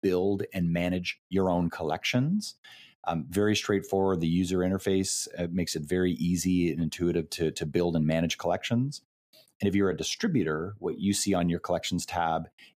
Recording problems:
uneven, jittery; strongly; from 0.5 to 11 s

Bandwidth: 15 kHz